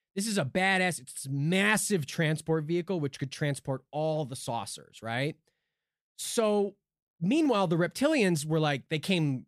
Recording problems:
none

